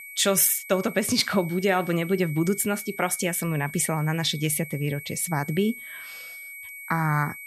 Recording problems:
high-pitched whine; noticeable; throughout; 2.5 kHz, 15 dB below the speech

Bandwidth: 14.5 kHz